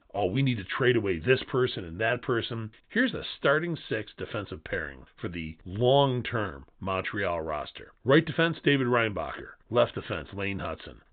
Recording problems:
high frequencies cut off; severe; nothing above 4 kHz

